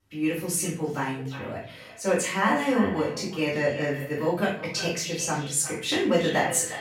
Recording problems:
off-mic speech; far
echo of what is said; noticeable; throughout; 350 ms later, 15 dB below the speech
room echo; noticeable; dies away in 0.4 s

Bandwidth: 16 kHz